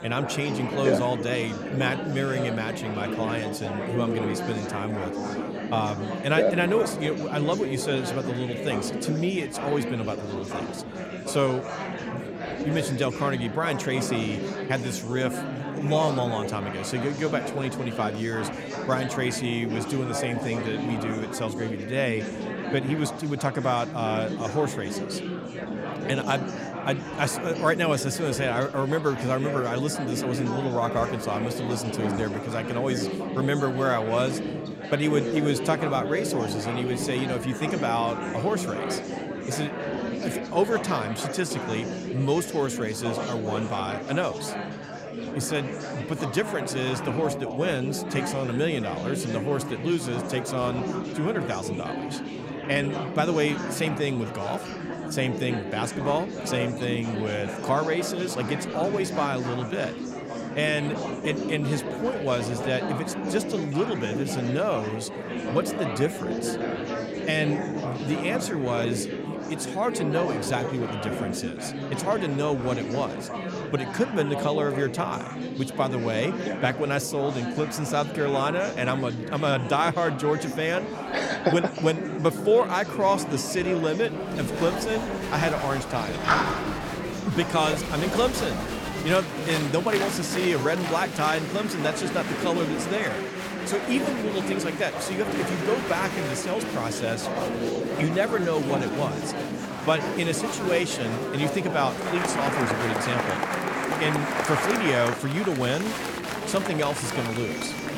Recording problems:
murmuring crowd; loud; throughout; 3 dB below the speech

